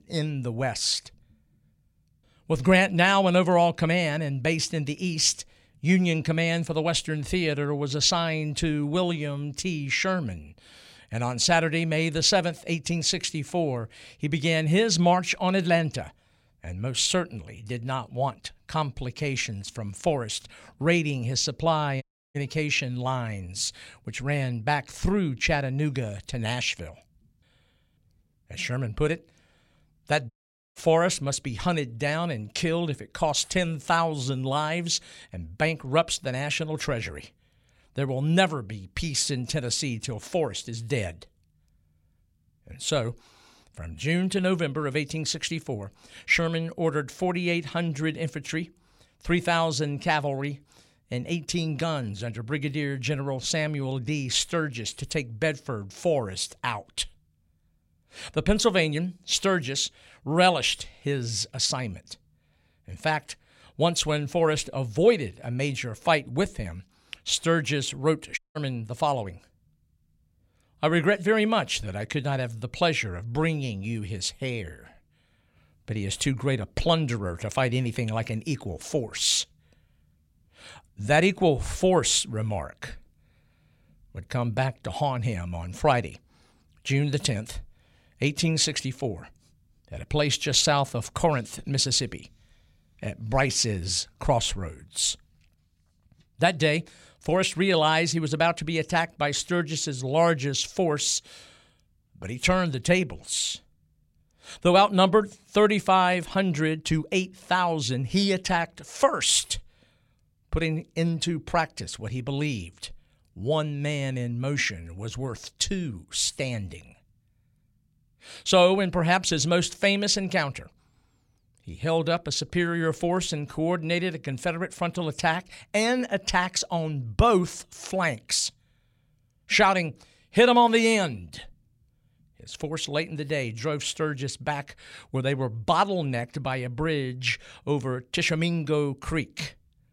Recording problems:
audio cutting out; at 22 s, at 30 s and at 1:08

